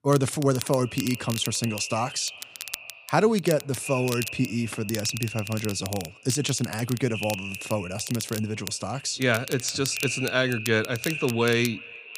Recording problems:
echo of what is said; strong; throughout; 350 ms later, 10 dB below the speech
crackle, like an old record; noticeable; 10 dB below the speech

